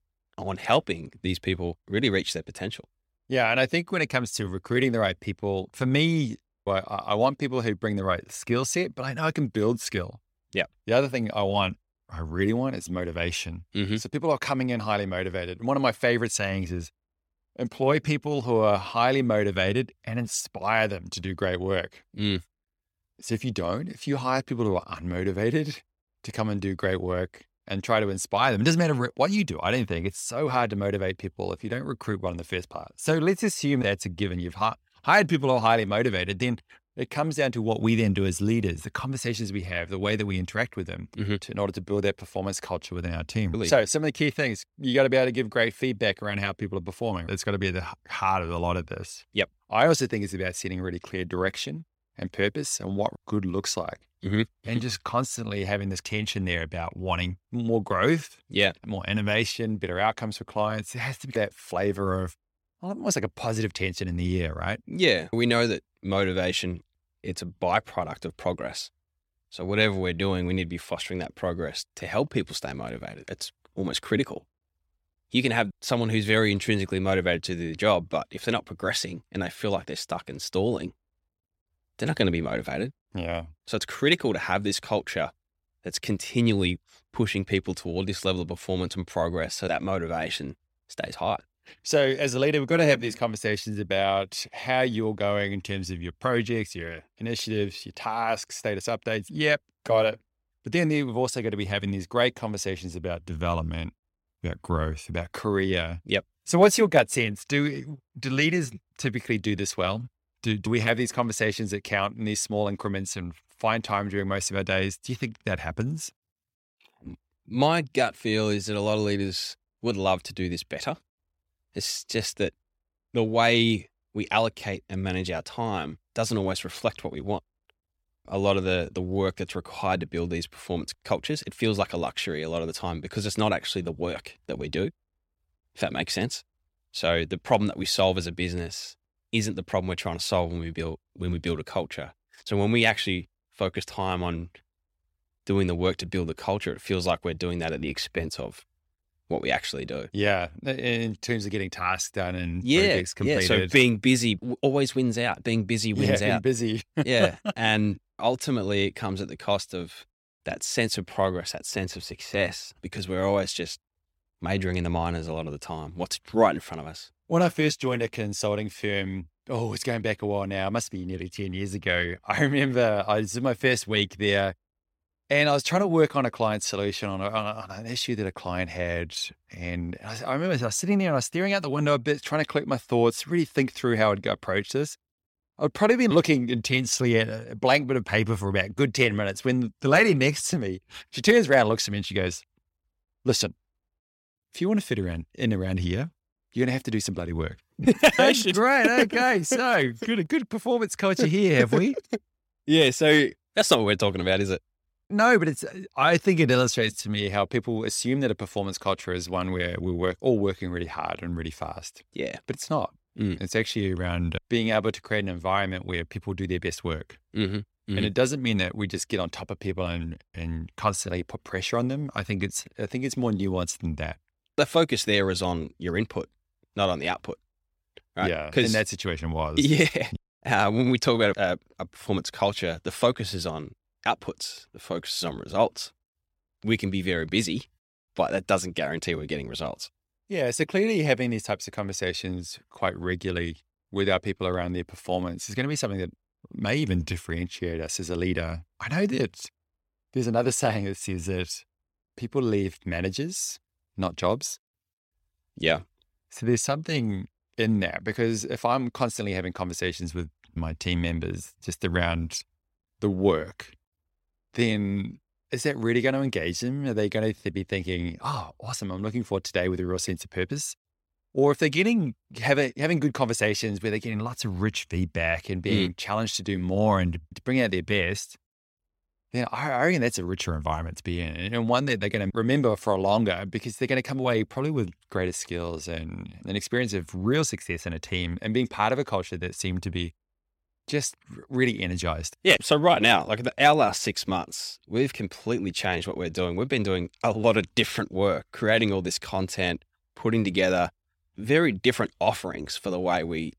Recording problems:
none

